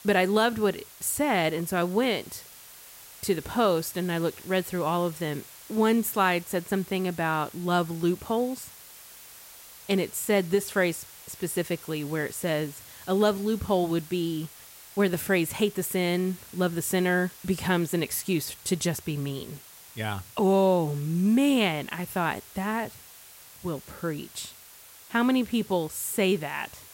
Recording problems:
hiss; noticeable; throughout; 20 dB below the speech

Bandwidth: 16 kHz